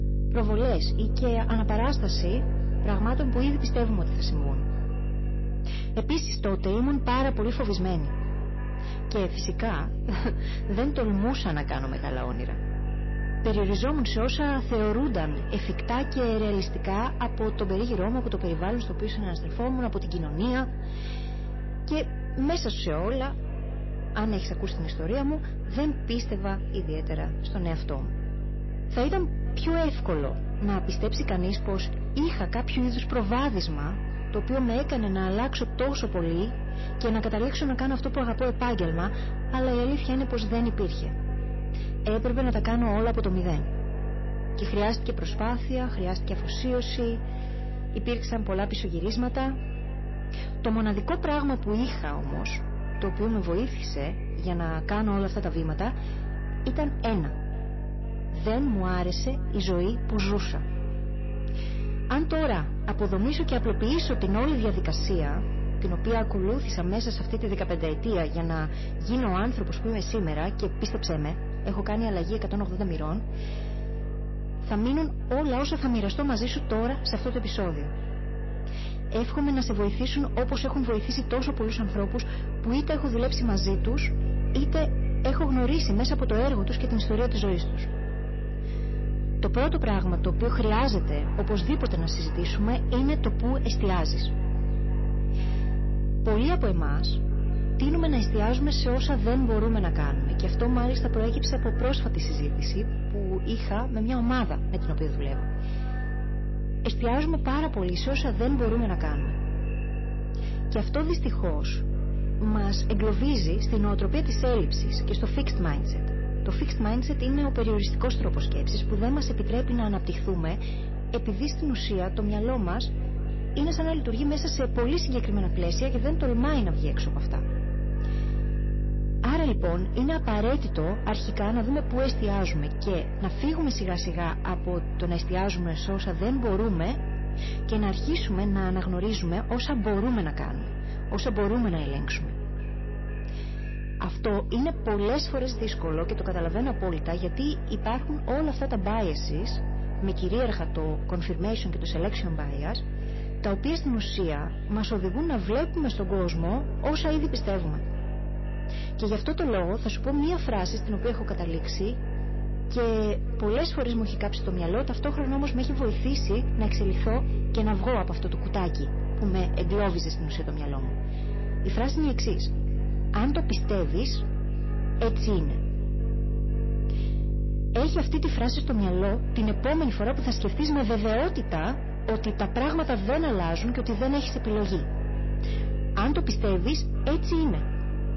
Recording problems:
echo of what is said; noticeable; throughout; 490 ms later, 15 dB below the speech
distortion; slight; 8% of the sound clipped
garbled, watery; slightly; nothing above 6 kHz
electrical hum; noticeable; throughout; 50 Hz, 15 dB below the speech

